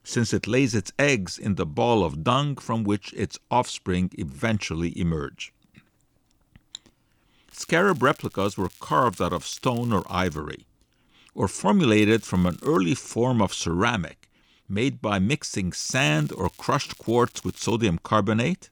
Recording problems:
crackling; faint; from 7.5 to 10 s, at 12 s and from 16 to 18 s; 25 dB below the speech

